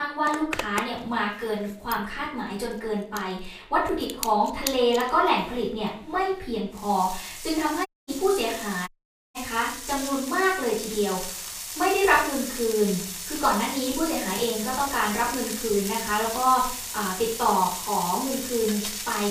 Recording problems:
off-mic speech; far
room echo; slight; dies away in 0.5 s
household noises; loud; throughout; 7 dB below the speech
abrupt cut into speech; at the start
audio cutting out; at 8 s and at 9 s

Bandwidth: 15 kHz